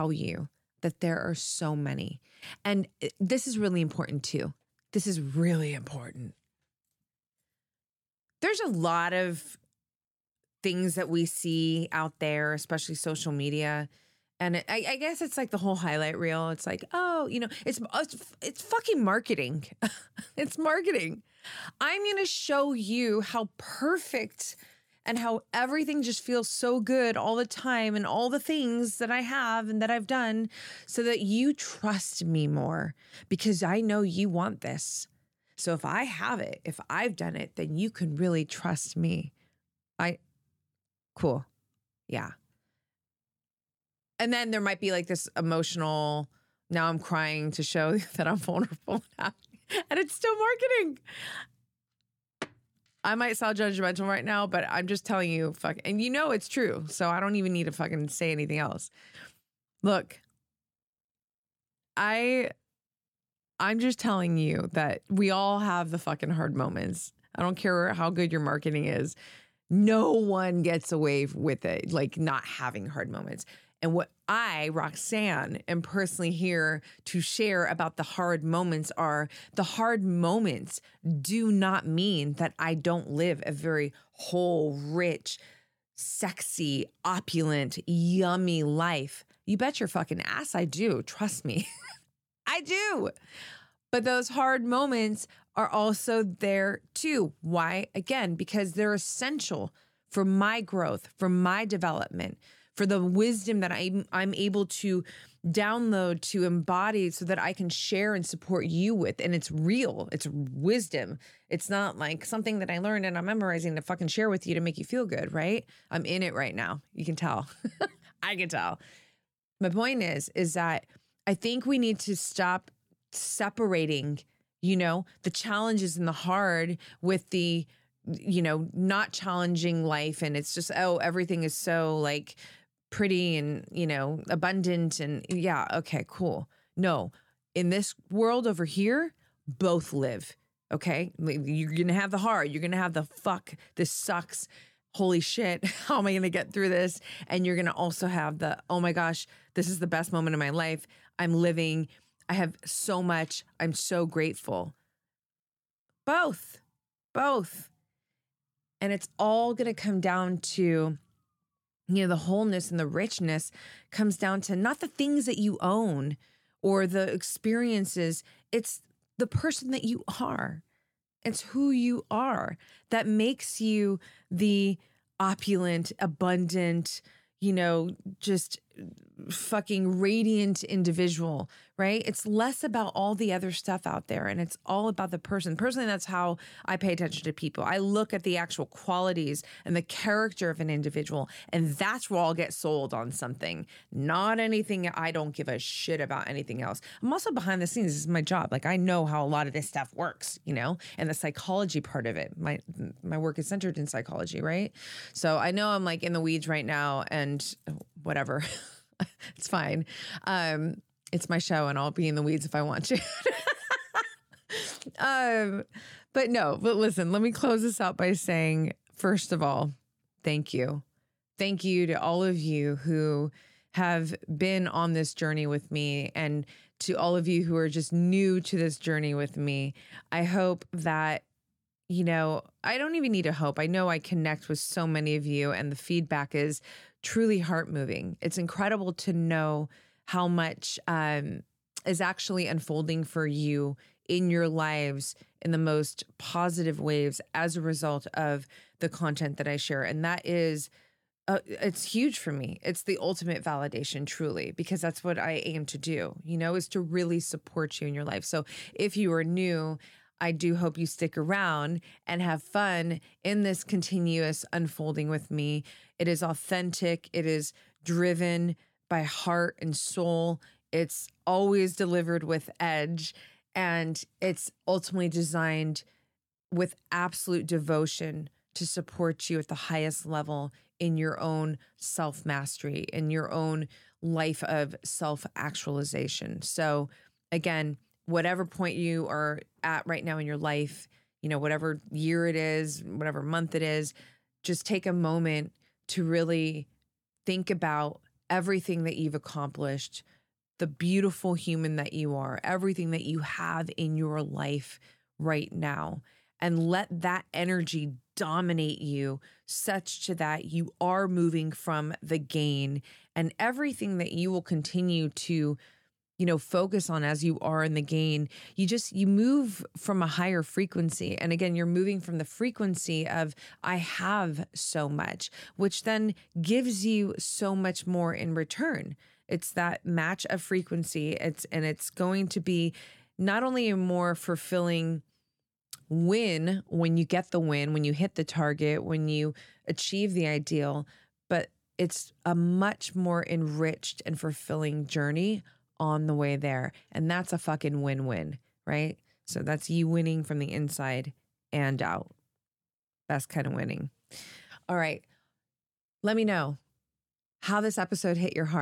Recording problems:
abrupt cut into speech; at the start and the end

